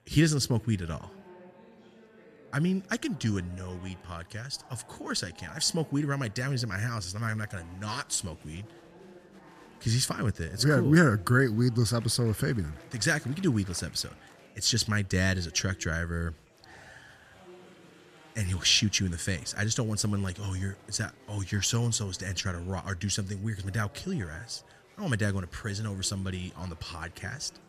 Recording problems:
murmuring crowd; faint; throughout; 25 dB below the speech

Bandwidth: 13.5 kHz